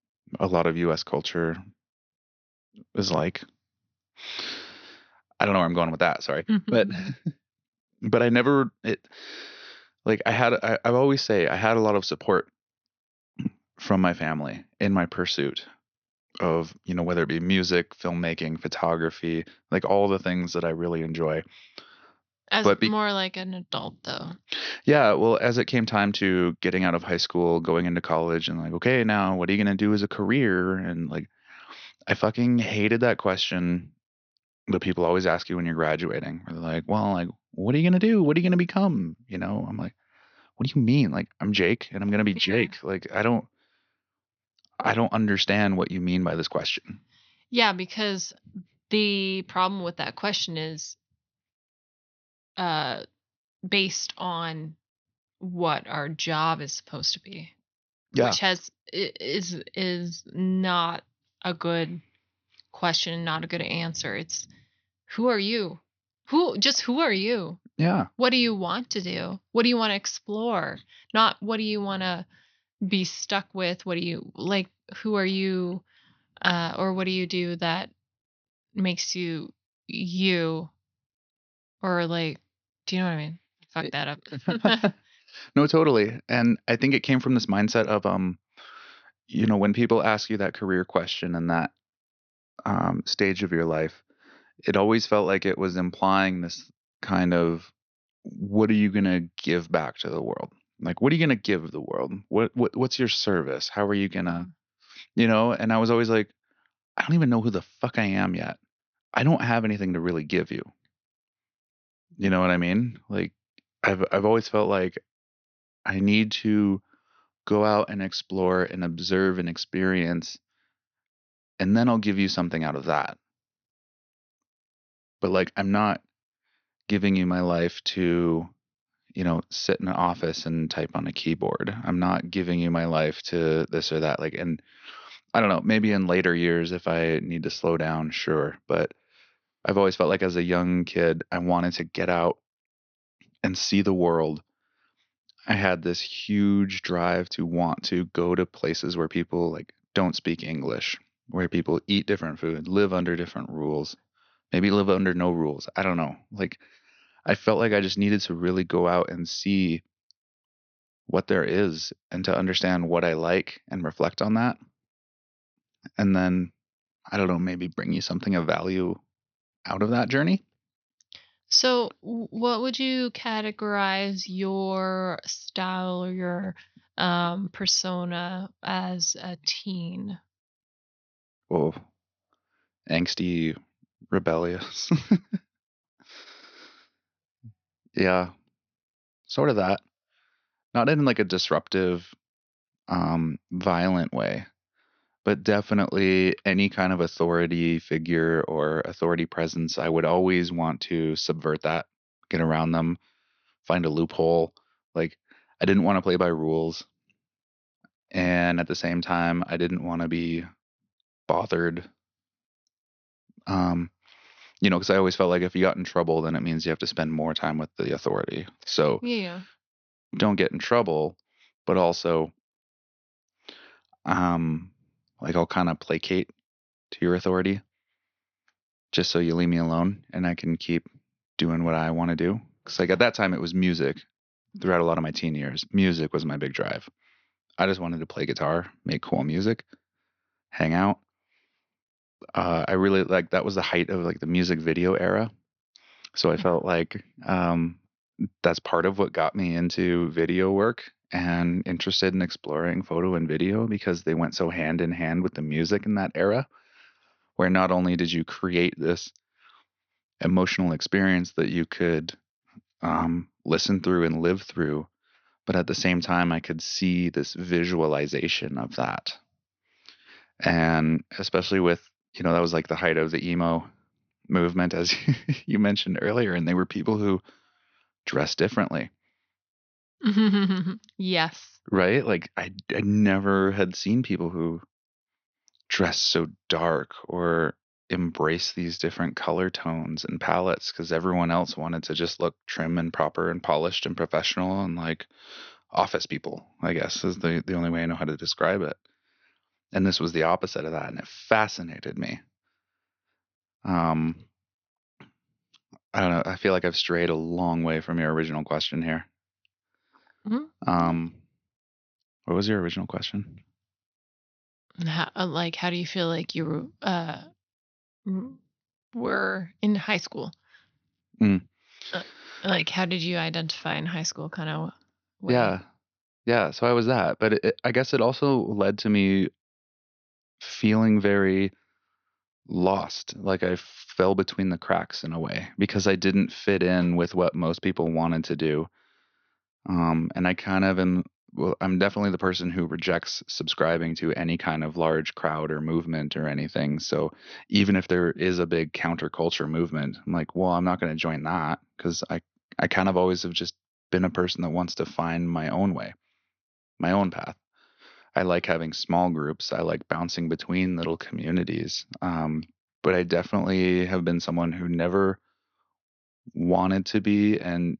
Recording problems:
high frequencies cut off; noticeable; nothing above 6 kHz

